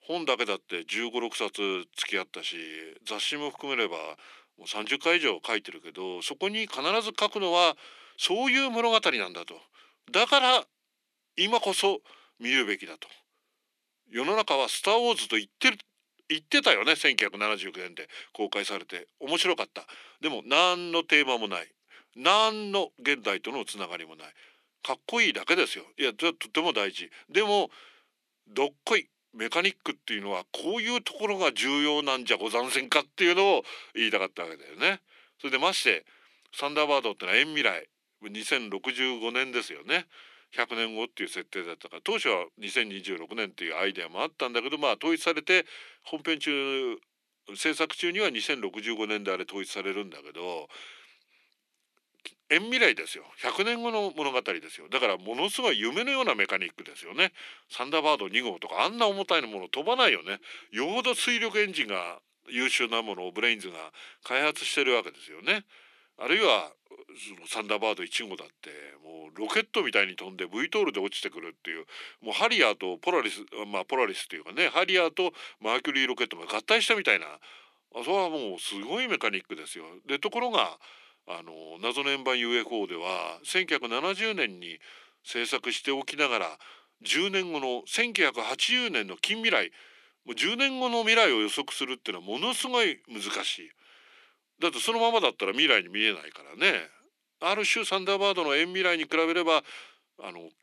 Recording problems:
thin; somewhat; fading below 300 Hz

